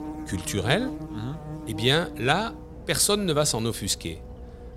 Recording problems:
electrical hum; noticeable; throughout; 60 Hz, 15 dB below the speech

